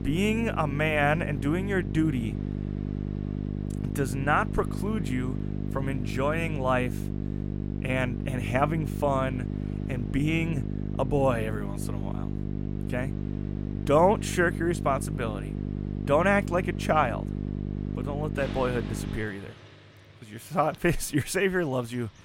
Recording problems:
electrical hum; noticeable; until 19 s; 50 Hz, 15 dB below the speech
traffic noise; faint; throughout; 20 dB below the speech

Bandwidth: 16 kHz